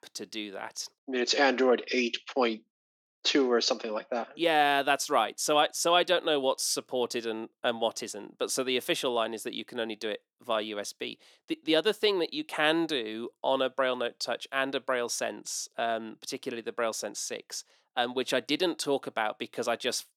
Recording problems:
thin; very slightly; fading below 300 Hz

